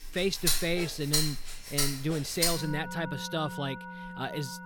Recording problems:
background music; very loud; throughout; 1 dB above the speech

